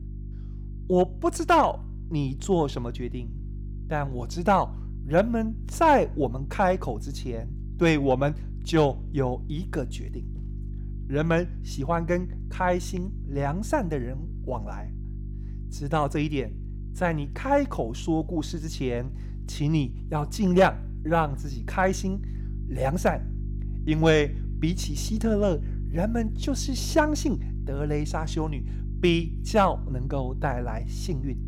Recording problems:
electrical hum; faint; throughout; 50 Hz, 20 dB below the speech

